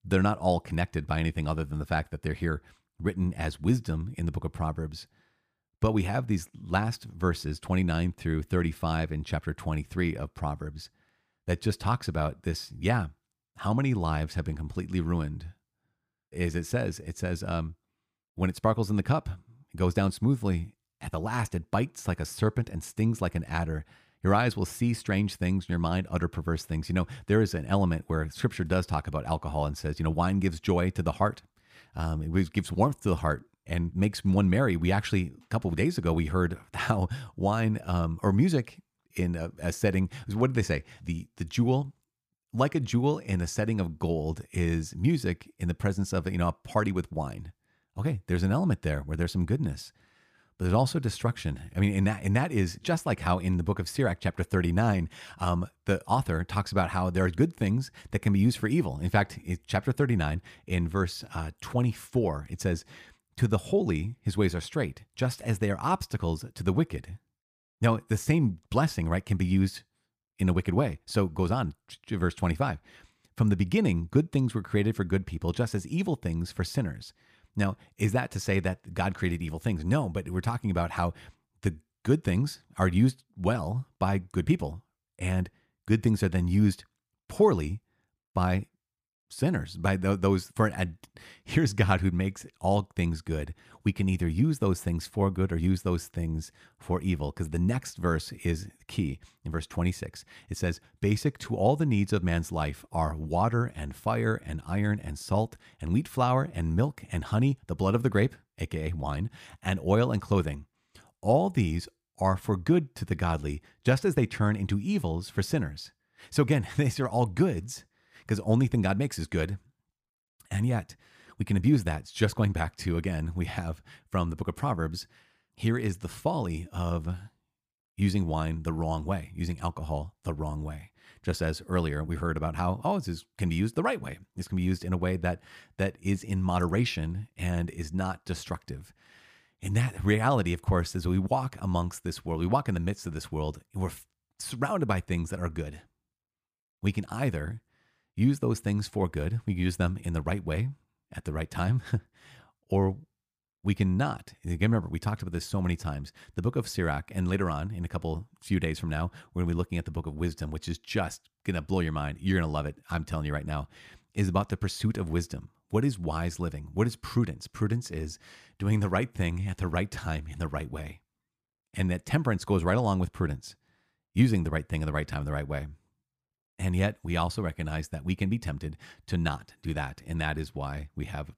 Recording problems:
none

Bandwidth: 15 kHz